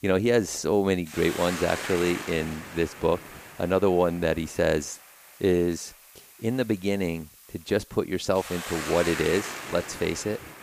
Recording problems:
hiss; loud; throughout; 9 dB below the speech

